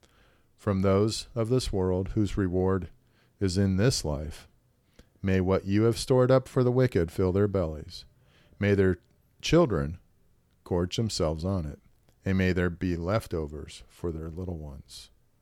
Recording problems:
none

